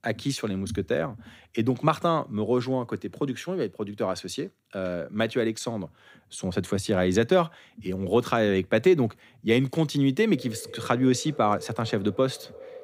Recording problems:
echo of what is said; noticeable; from 10 s on; 370 ms later, 15 dB below the speech

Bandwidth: 15.5 kHz